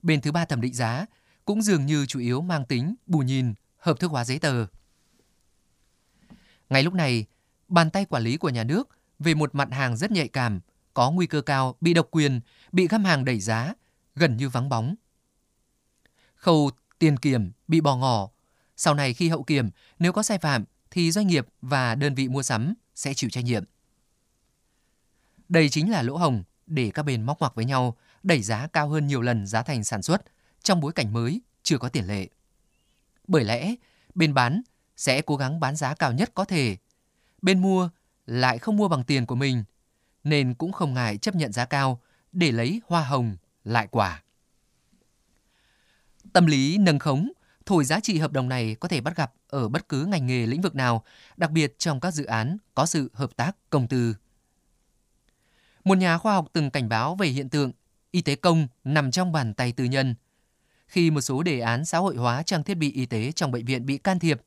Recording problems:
none

